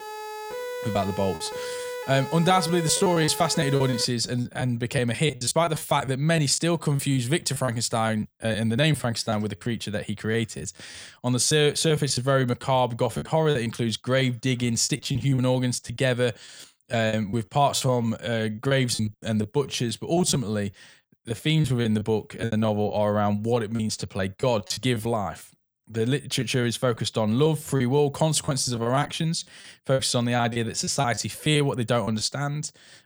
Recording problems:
choppy; very; 12% of the speech affected
siren; noticeable; until 4 s; peak 8 dB below the speech

